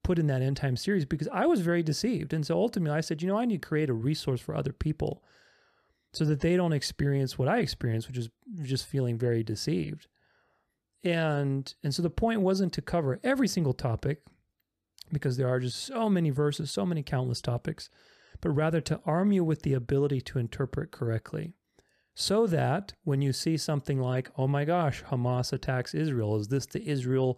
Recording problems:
none

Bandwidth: 14.5 kHz